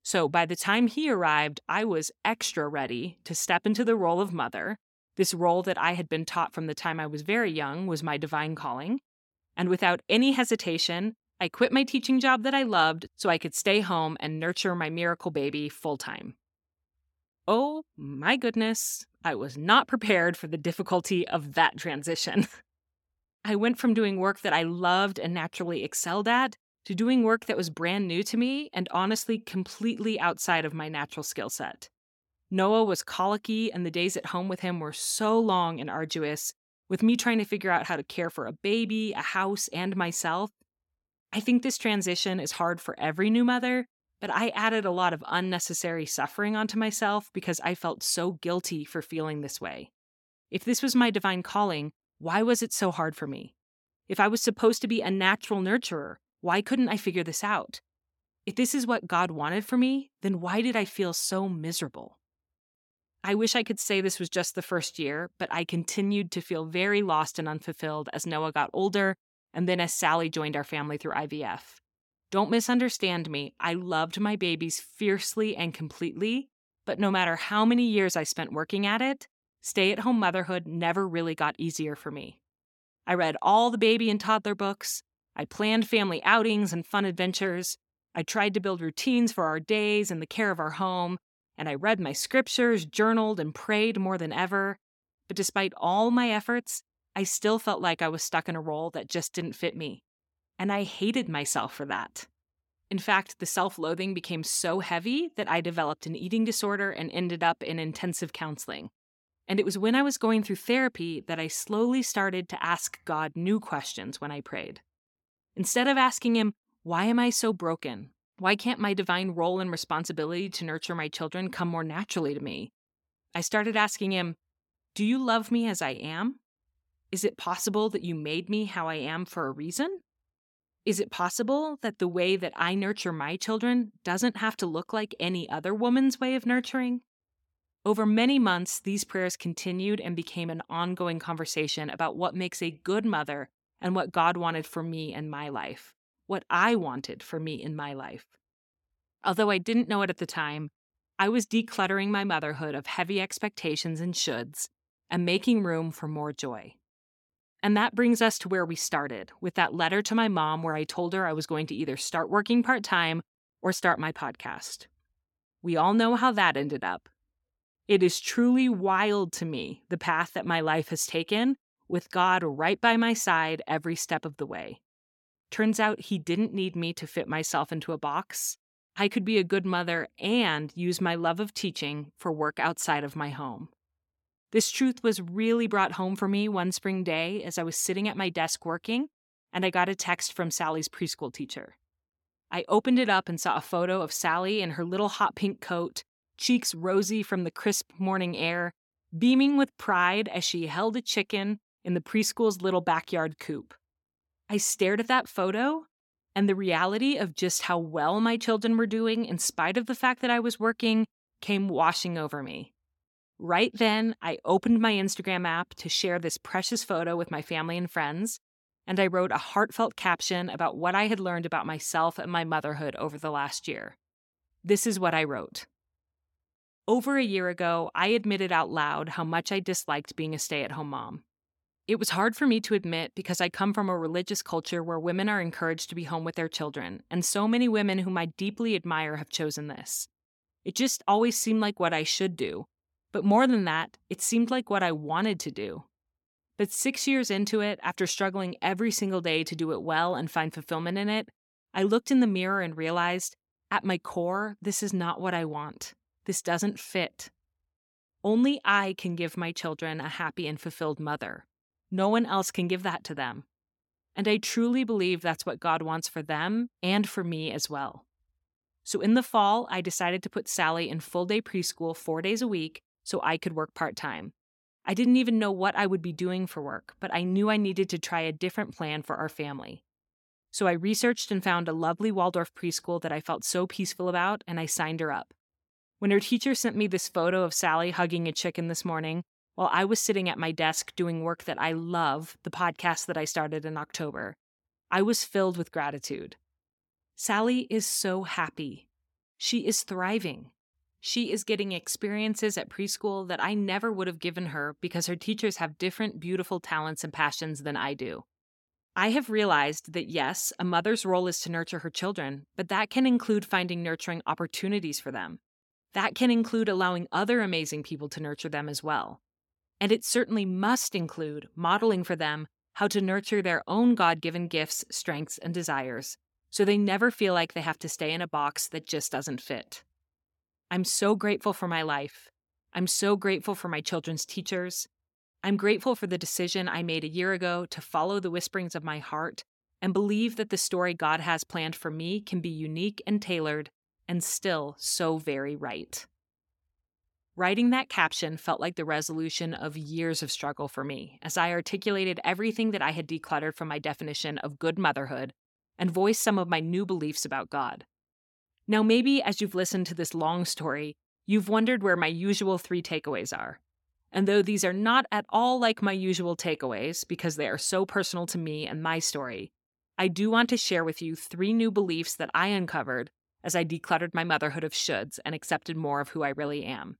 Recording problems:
none

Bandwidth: 17 kHz